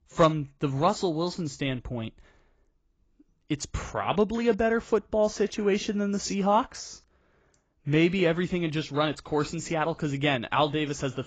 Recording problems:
garbled, watery; badly; nothing above 7.5 kHz

